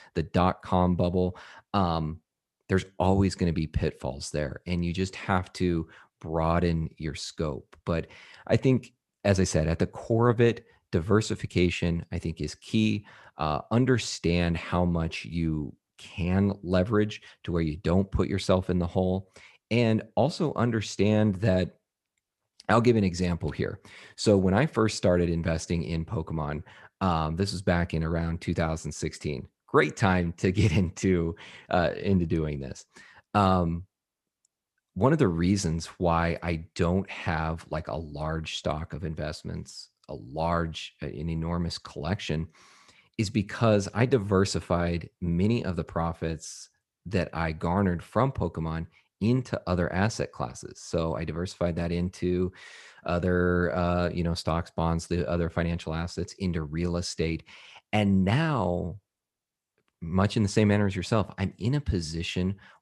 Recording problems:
none

